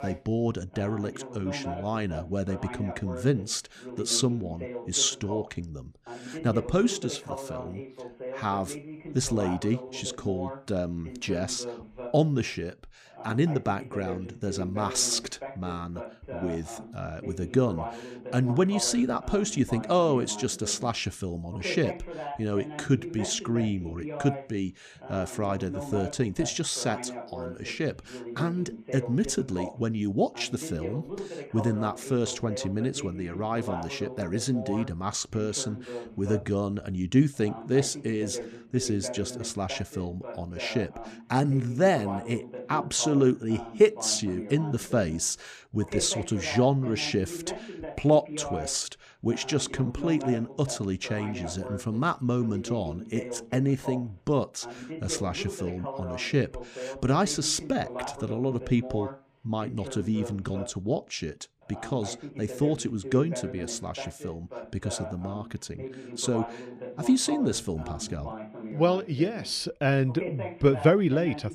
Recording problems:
voice in the background; noticeable; throughout; 10 dB below the speech

